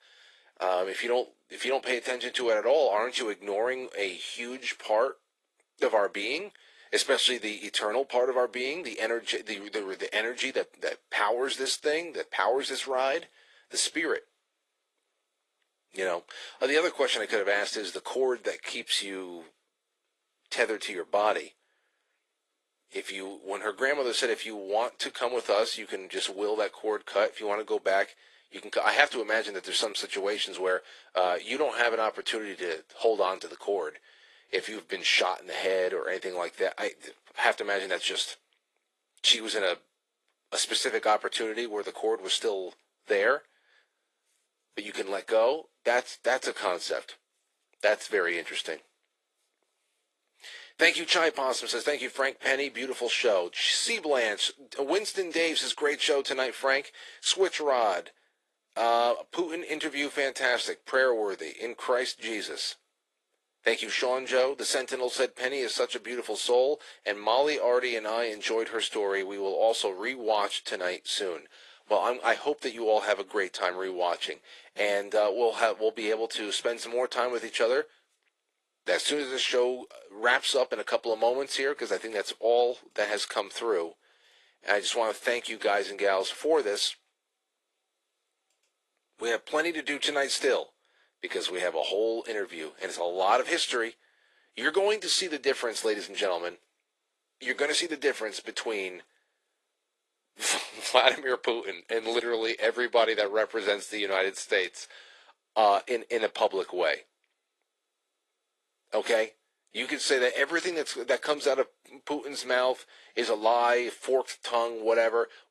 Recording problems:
thin; very; fading below 400 Hz
garbled, watery; slightly

